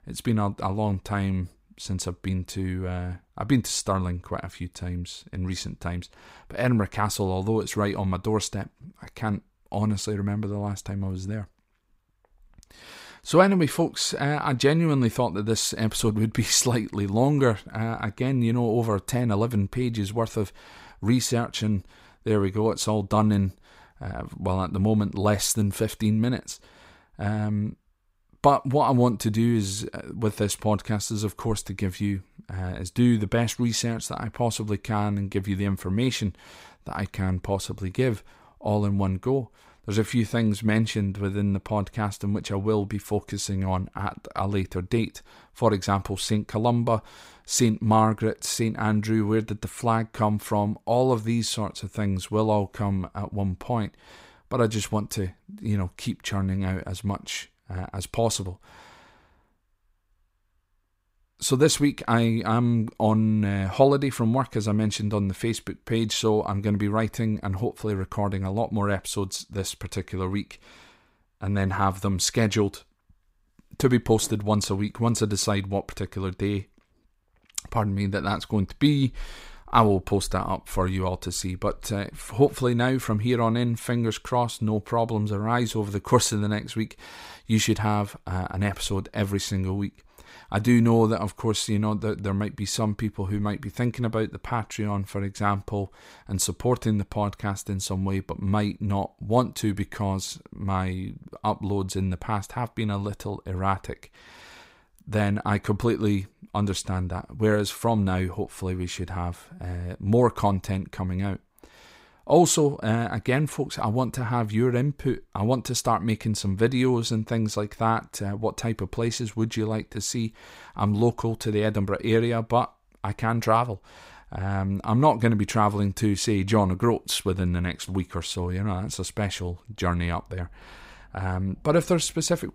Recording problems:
none

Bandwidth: 15.5 kHz